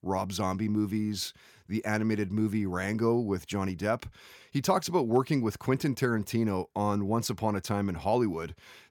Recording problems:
none

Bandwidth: 17.5 kHz